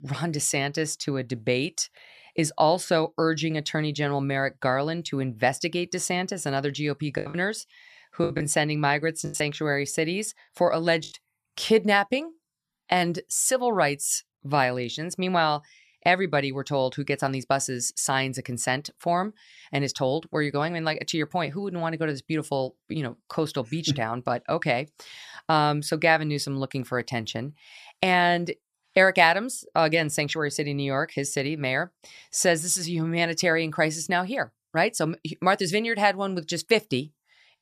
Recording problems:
choppy; very; from 7 to 11 s; 8% of the speech affected

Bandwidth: 14.5 kHz